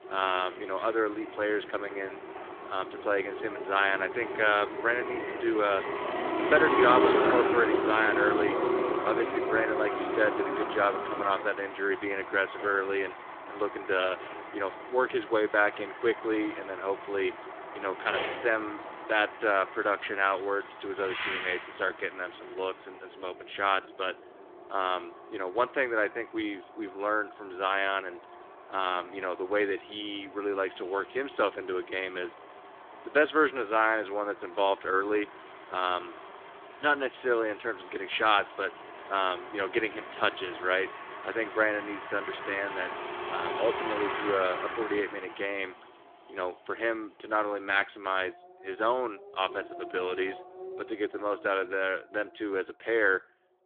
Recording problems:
phone-call audio; nothing above 3.5 kHz
traffic noise; loud; throughout; 4 dB below the speech

